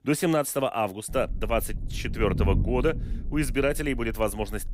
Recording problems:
low rumble; noticeable; from 1 s on; 15 dB below the speech

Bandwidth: 15.5 kHz